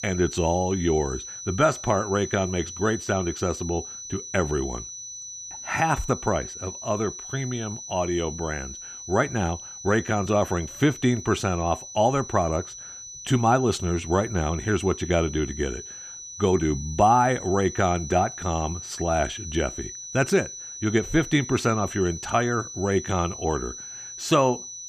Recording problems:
high-pitched whine; noticeable; throughout; 6 kHz, 10 dB below the speech

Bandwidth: 14.5 kHz